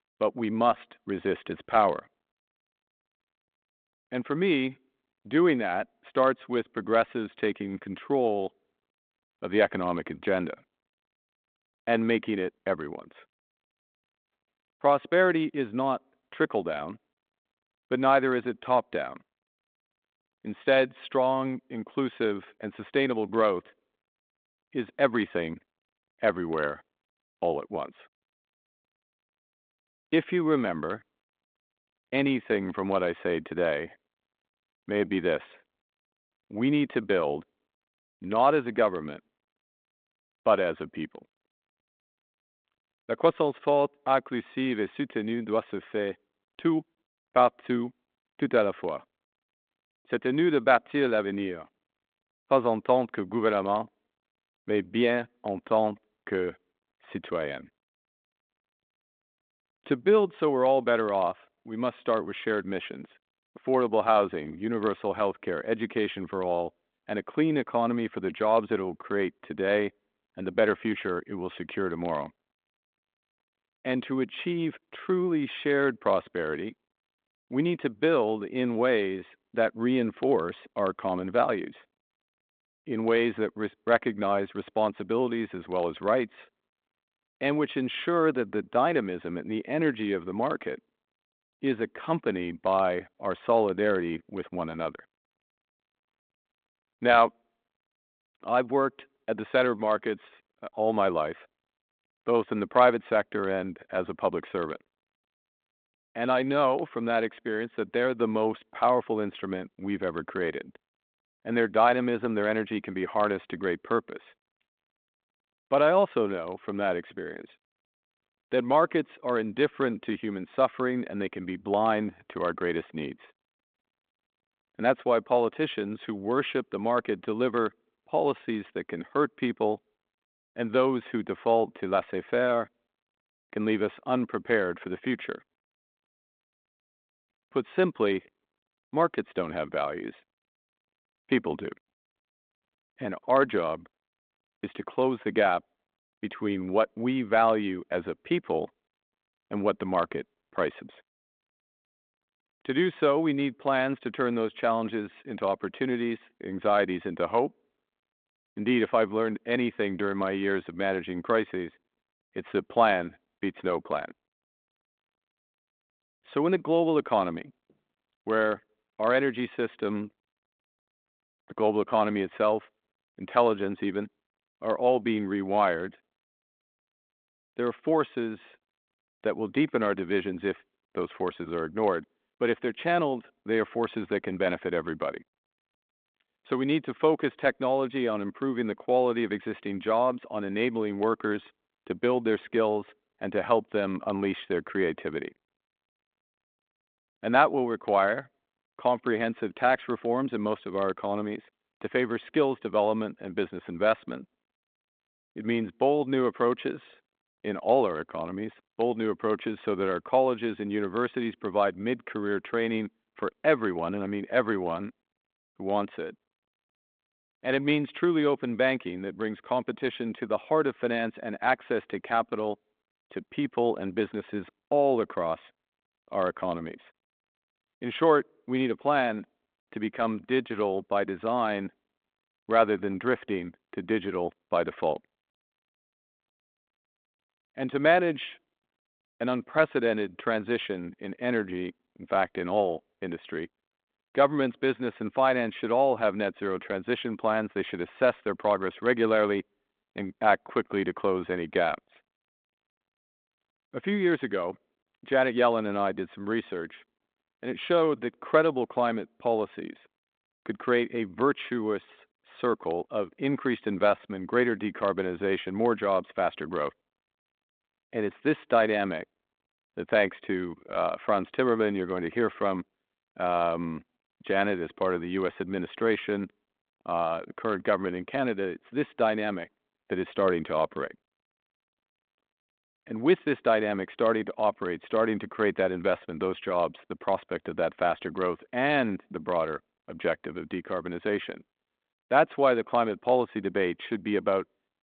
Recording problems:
phone-call audio; nothing above 3.5 kHz

